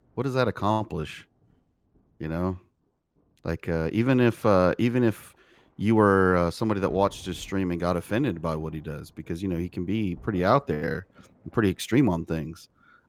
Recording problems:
rain or running water; faint; throughout; 30 dB below the speech

